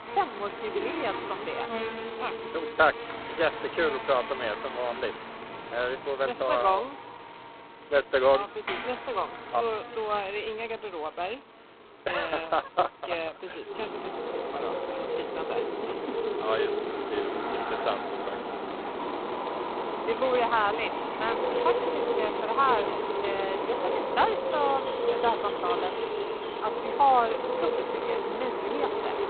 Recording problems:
phone-call audio; poor line; nothing above 4 kHz
animal sounds; loud; throughout; 2 dB below the speech

